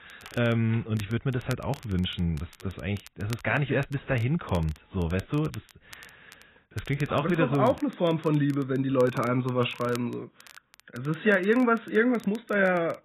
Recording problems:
garbled, watery; badly; nothing above 4 kHz
crackle, like an old record; faint; 25 dB below the speech

